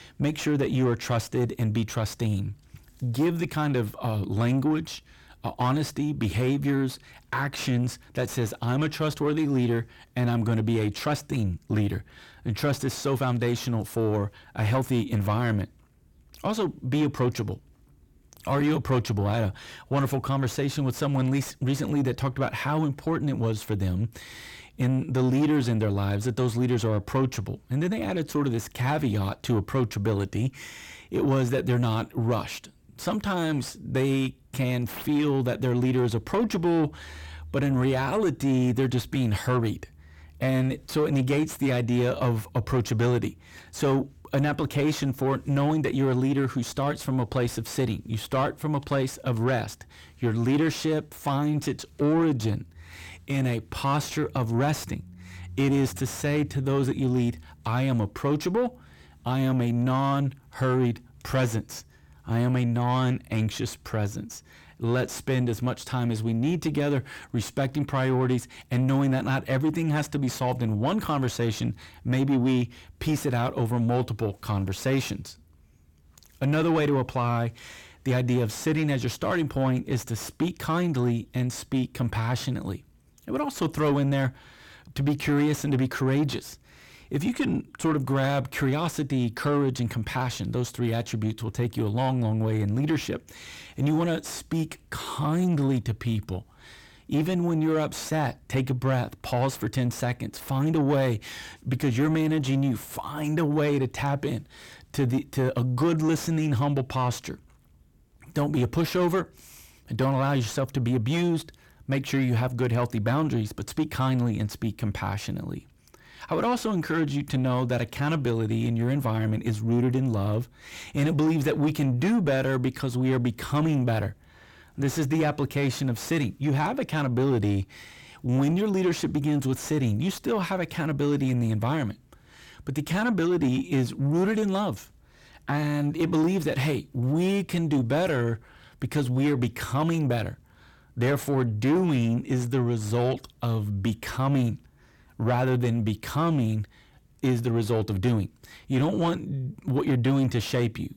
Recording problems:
distortion; slight; 10 dB below the speech

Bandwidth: 17 kHz